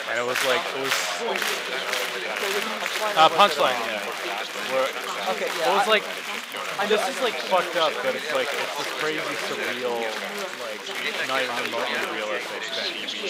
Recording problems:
thin; very; fading below 550 Hz
chatter from many people; loud; throughout; 1 dB below the speech

